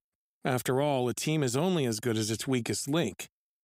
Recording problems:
none

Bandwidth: 15.5 kHz